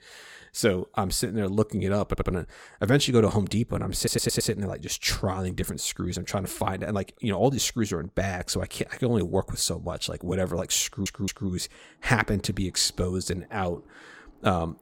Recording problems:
audio stuttering; at 2 s, at 4 s and at 11 s

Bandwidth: 16.5 kHz